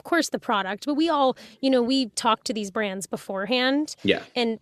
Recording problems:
none

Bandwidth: 13.5 kHz